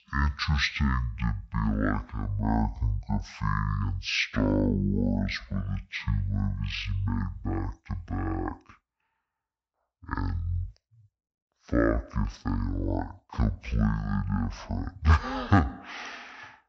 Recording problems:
wrong speed and pitch; too slow and too low; 0.5 times normal speed

